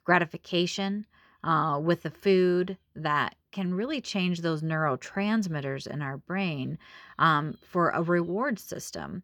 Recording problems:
none

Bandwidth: 18.5 kHz